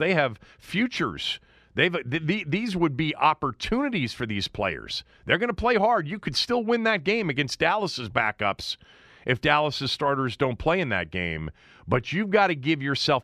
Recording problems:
abrupt cut into speech; at the start

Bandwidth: 14 kHz